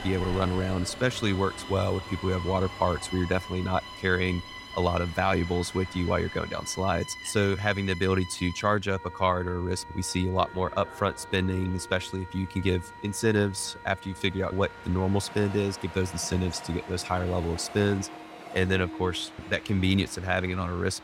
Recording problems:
background music; noticeable; throughout; 15 dB below the speech
train or aircraft noise; noticeable; throughout; 15 dB below the speech
high-pitched whine; faint; throughout; 4 kHz, 35 dB below the speech

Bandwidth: 16 kHz